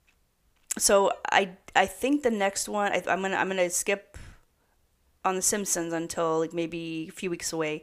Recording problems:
none

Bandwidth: 15 kHz